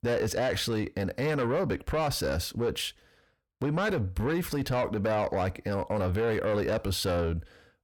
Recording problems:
distortion; slight; 10 dB below the speech

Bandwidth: 18 kHz